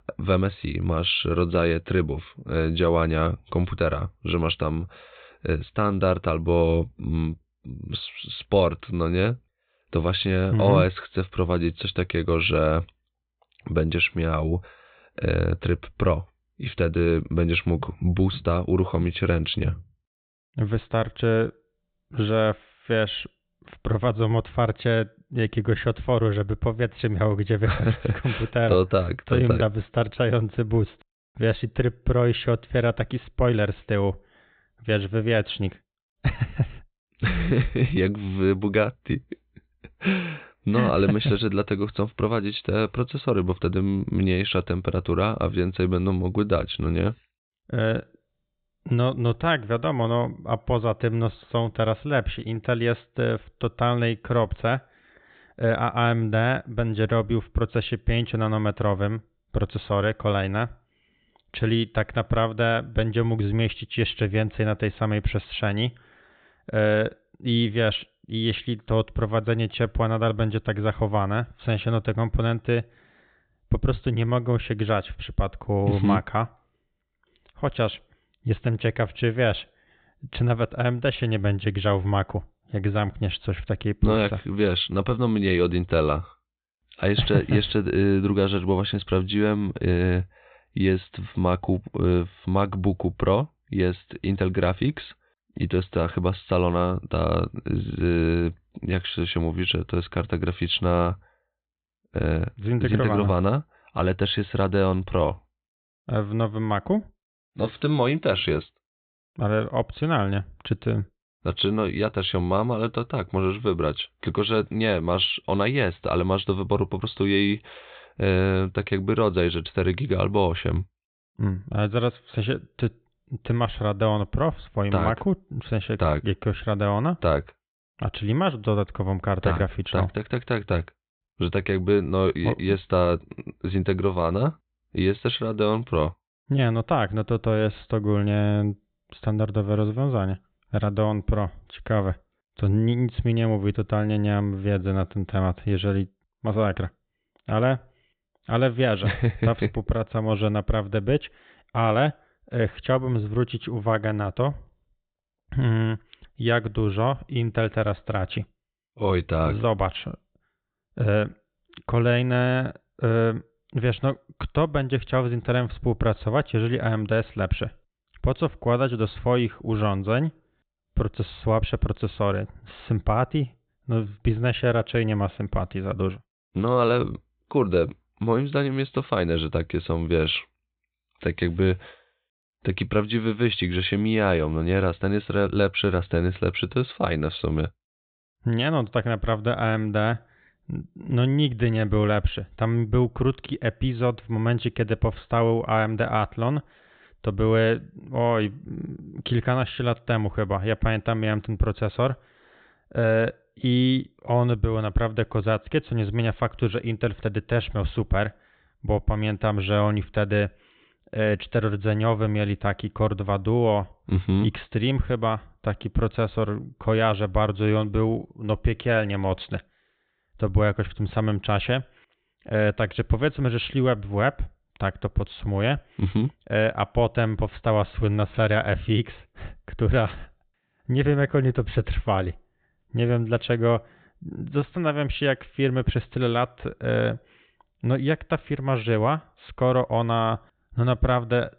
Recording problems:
high frequencies cut off; severe; nothing above 4 kHz

